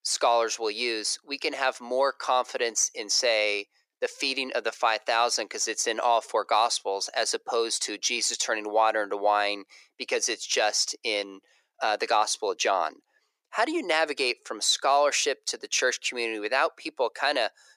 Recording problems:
thin; very; fading below 400 Hz

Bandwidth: 15 kHz